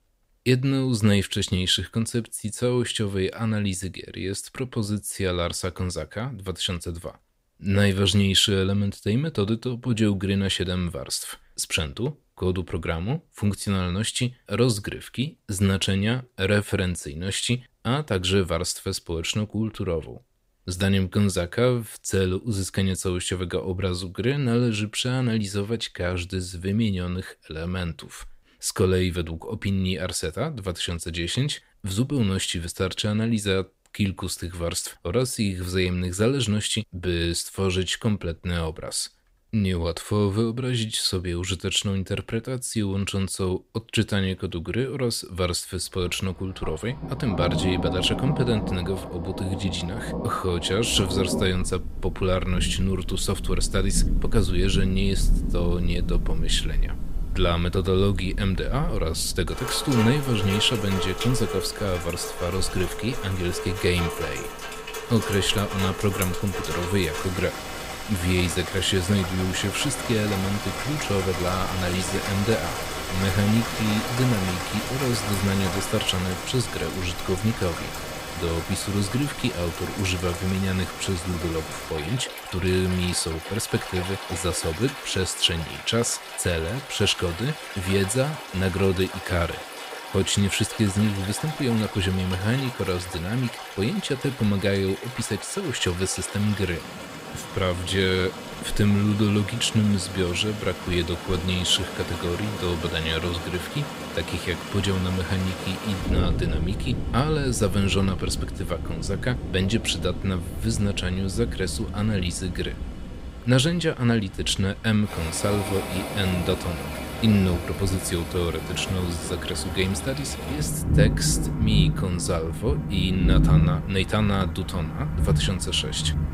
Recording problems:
rain or running water; loud; from 46 s on; 6 dB below the speech

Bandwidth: 15.5 kHz